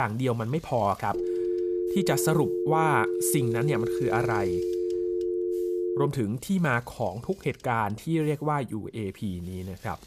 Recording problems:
machinery noise; faint; throughout; 25 dB below the speech
abrupt cut into speech; at the start
phone ringing; loud; from 1 to 6 s; peak level with the speech

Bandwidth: 14.5 kHz